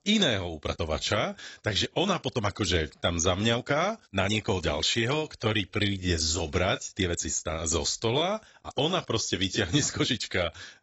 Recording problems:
garbled, watery; badly; nothing above 7.5 kHz
uneven, jittery; strongly; from 0.5 to 10 s

